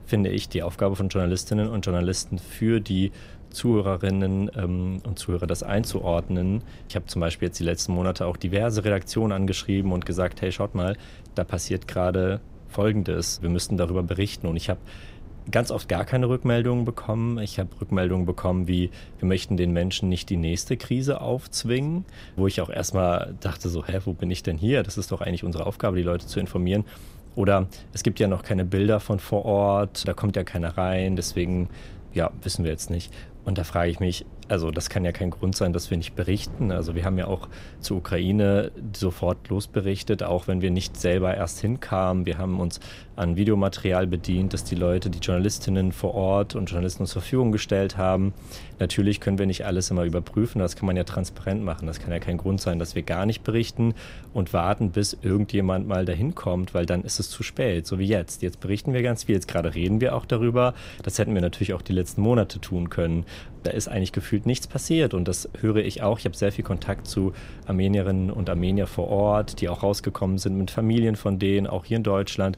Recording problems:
wind noise on the microphone; occasional gusts; 25 dB below the speech

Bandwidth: 15.5 kHz